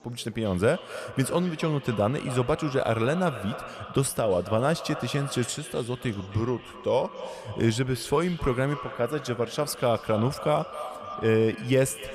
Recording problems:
echo of what is said; noticeable; throughout; 270 ms later, 15 dB below the speech
chatter from many people; faint; throughout; 25 dB below the speech

